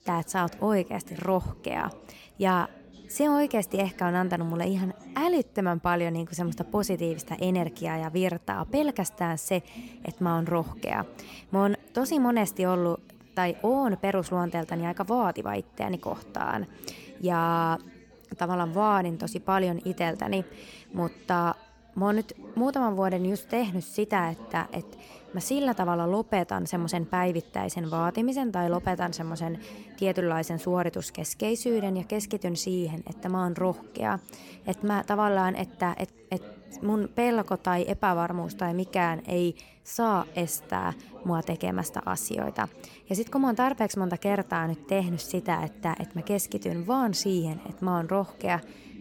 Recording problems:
background chatter; noticeable; throughout; 4 voices, 20 dB below the speech

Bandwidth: 17.5 kHz